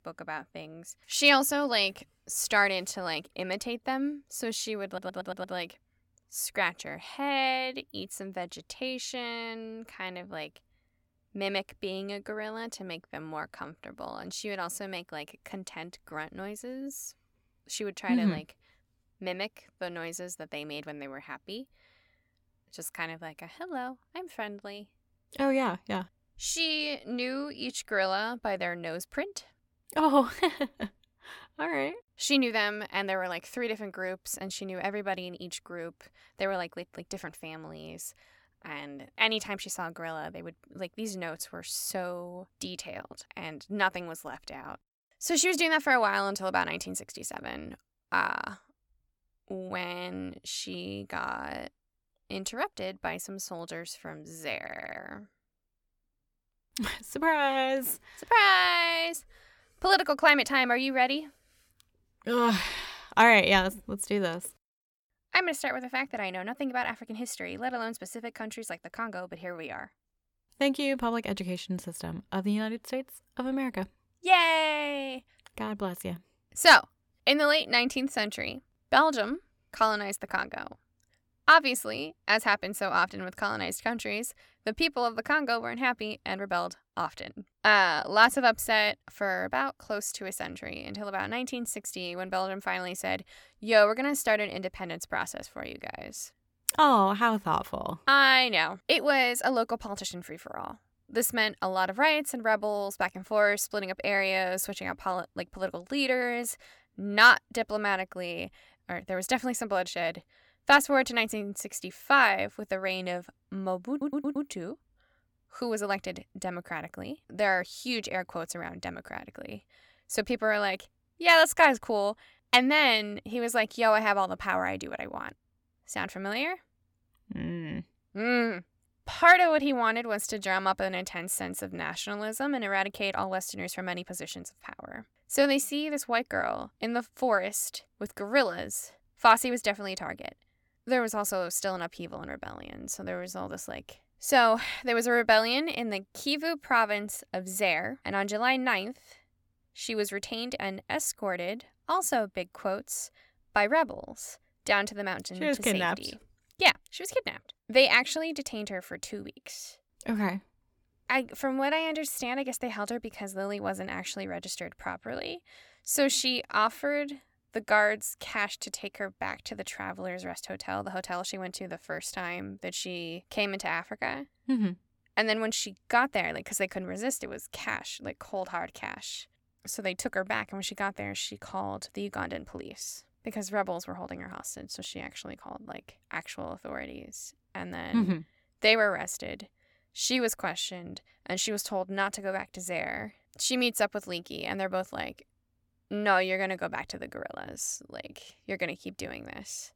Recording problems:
audio stuttering; at 5 s, at 55 s and at 1:54

